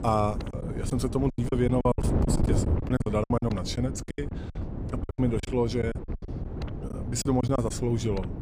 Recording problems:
wind noise on the microphone; heavy; 9 dB below the speech
choppy; very; 14% of the speech affected

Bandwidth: 15 kHz